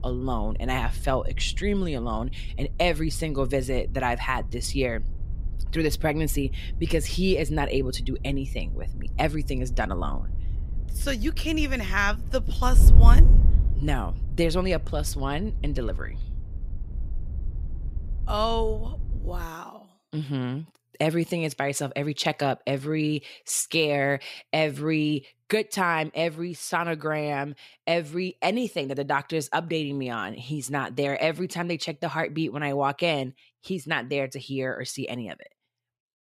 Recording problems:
wind noise on the microphone; occasional gusts; until 19 s; 20 dB below the speech

